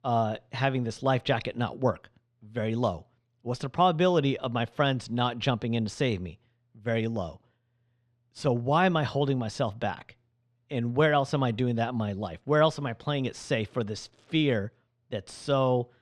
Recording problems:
muffled; slightly; fading above 3 kHz

